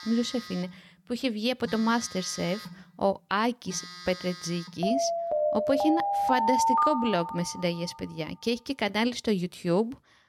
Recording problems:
alarms or sirens; loud; throughout; as loud as the speech

